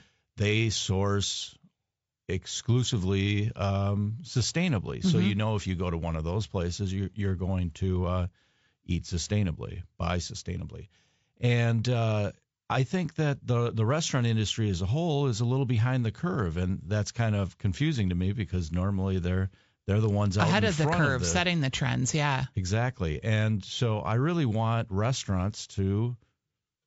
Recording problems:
high frequencies cut off; noticeable; nothing above 8 kHz

